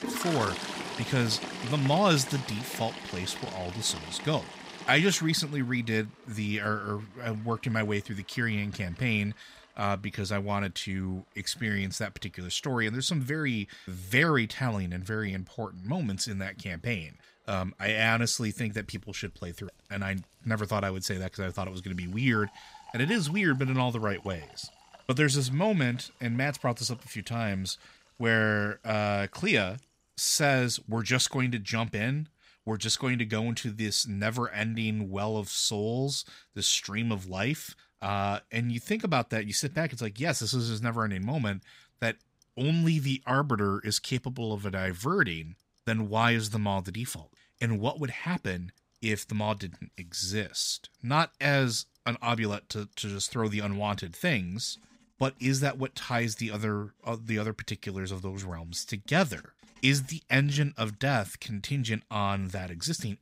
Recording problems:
household noises; noticeable; throughout; 15 dB below the speech

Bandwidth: 15.5 kHz